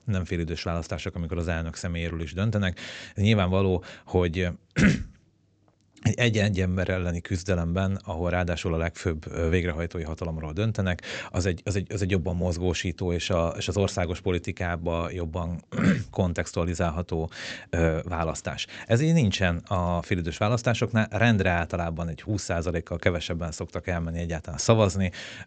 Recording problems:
high frequencies cut off; noticeable; nothing above 8 kHz

